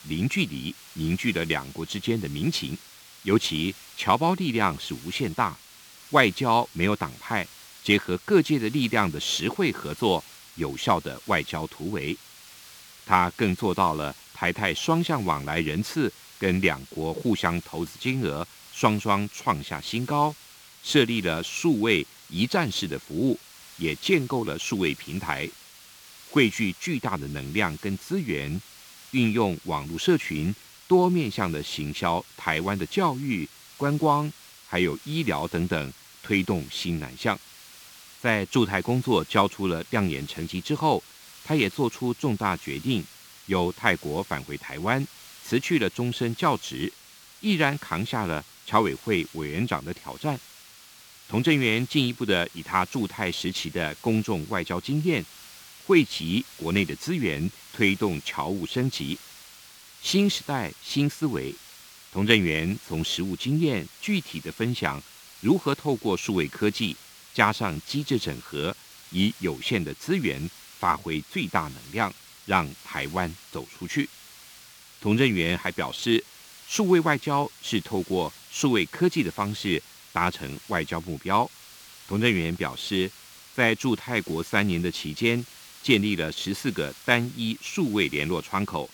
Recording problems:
hiss; noticeable; throughout; 20 dB below the speech

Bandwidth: 18.5 kHz